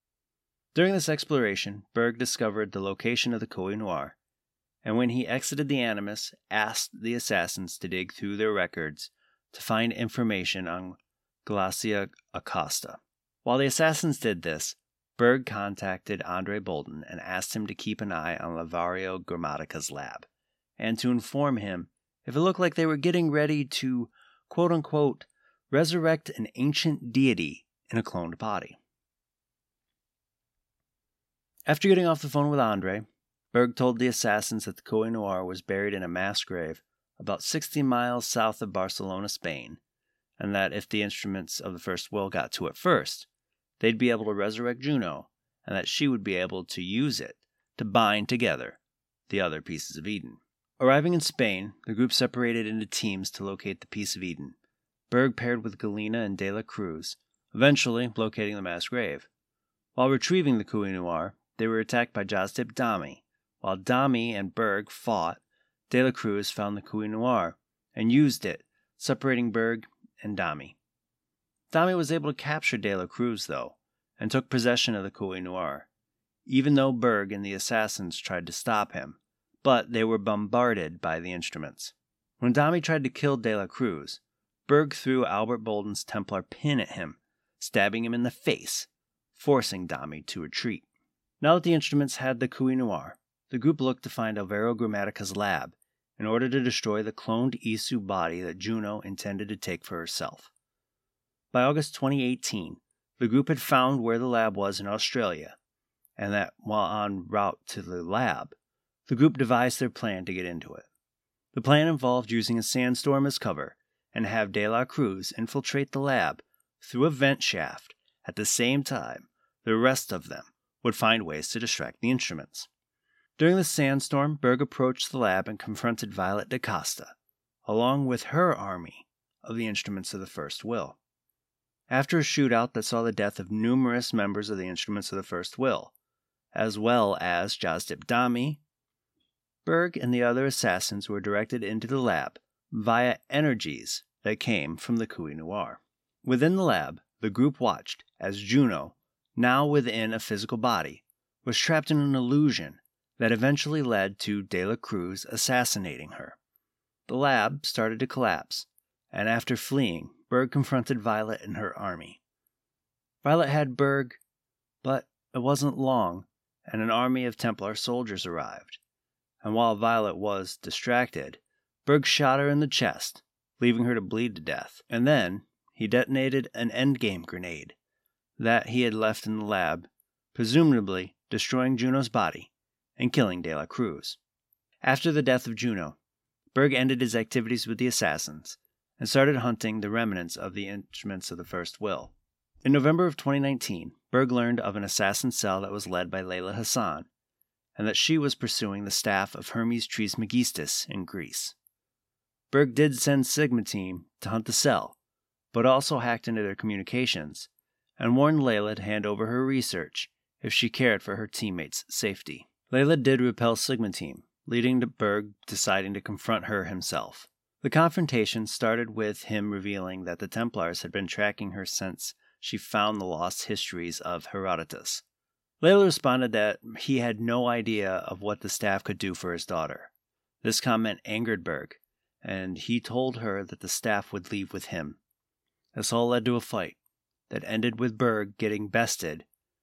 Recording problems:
none

